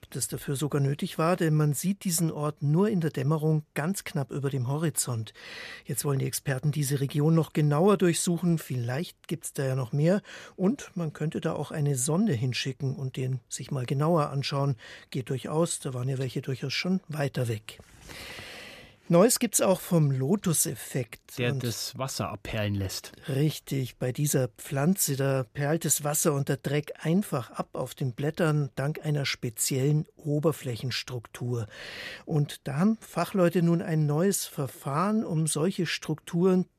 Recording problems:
none

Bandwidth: 14.5 kHz